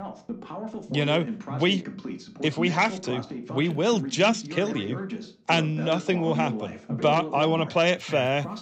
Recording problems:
voice in the background; loud; throughout; 10 dB below the speech

